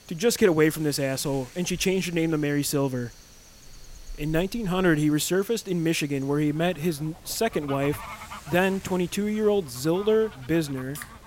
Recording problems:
animal sounds; faint; throughout; 20 dB below the speech
hiss; faint; throughout; 25 dB below the speech

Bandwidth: 16 kHz